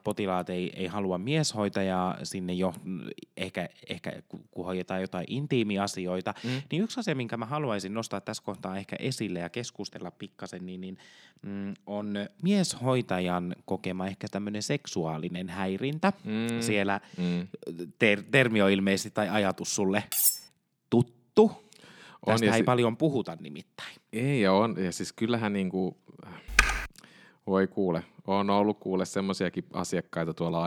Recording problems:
clattering dishes; loud; at 20 s; peak 6 dB above the speech
keyboard typing; loud; at 27 s; peak 5 dB above the speech
abrupt cut into speech; at the end

